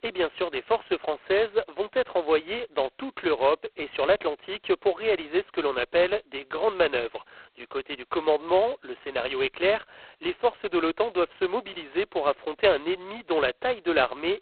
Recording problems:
phone-call audio; poor line; nothing above 4 kHz

